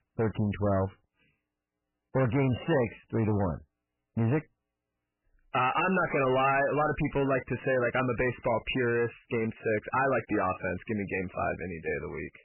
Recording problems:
distortion; heavy; 6 dB below the speech
garbled, watery; badly; nothing above 3 kHz

